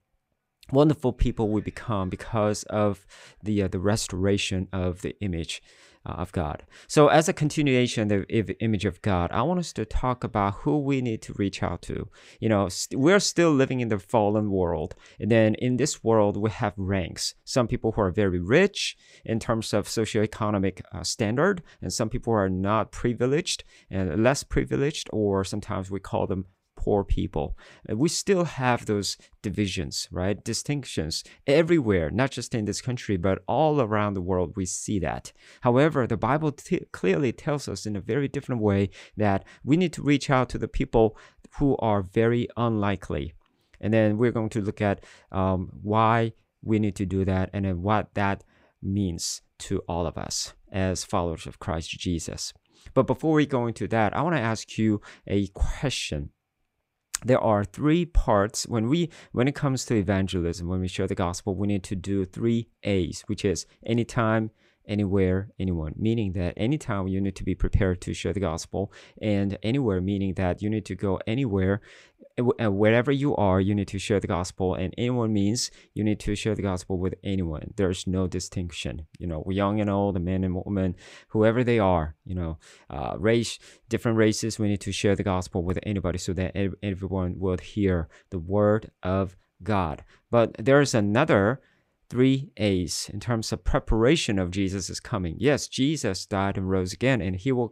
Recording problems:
none

